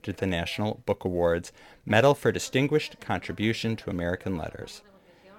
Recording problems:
voice in the background; faint; throughout; 25 dB below the speech

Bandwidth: 18 kHz